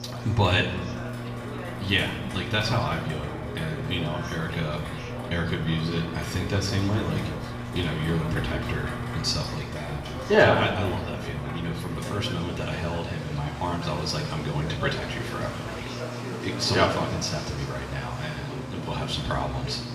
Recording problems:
off-mic speech; far
room echo; slight; dies away in 1 s
electrical hum; noticeable; throughout; 60 Hz, 15 dB below the speech
rain or running water; noticeable; throughout; 10 dB below the speech
chatter from many people; noticeable; throughout; 10 dB below the speech

